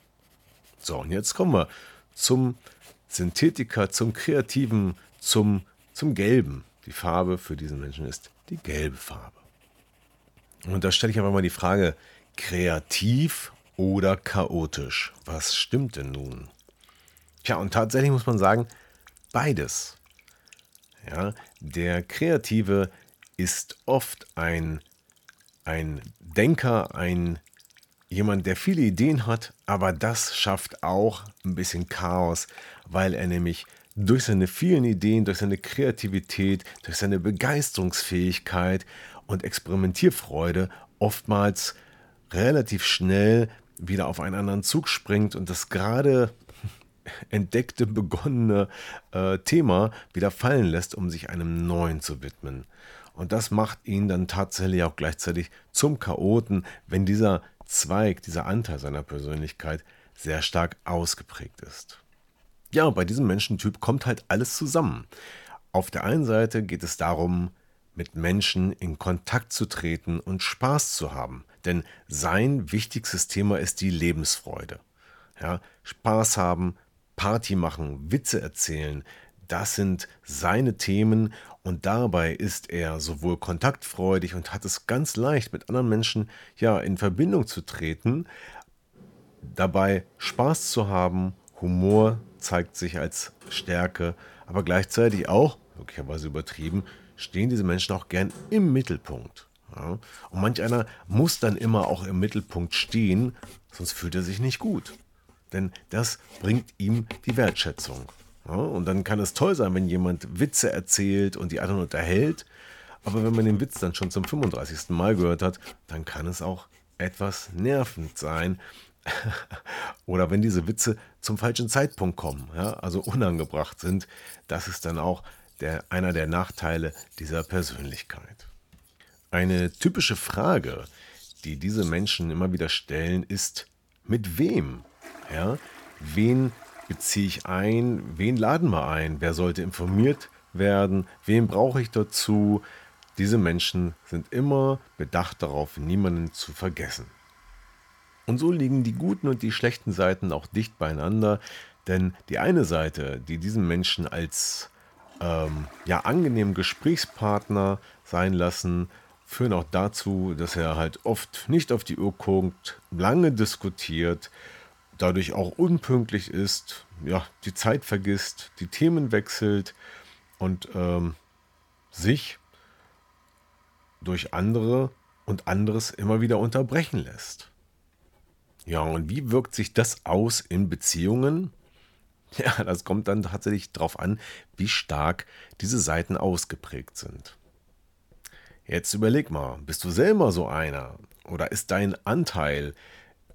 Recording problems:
household noises; faint; throughout; 25 dB below the speech

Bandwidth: 17.5 kHz